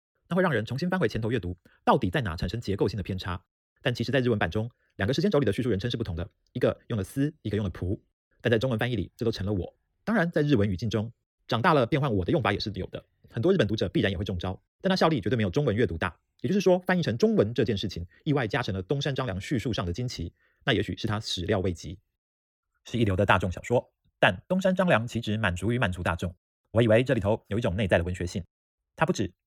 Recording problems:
wrong speed, natural pitch; too fast; 1.7 times normal speed

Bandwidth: 18 kHz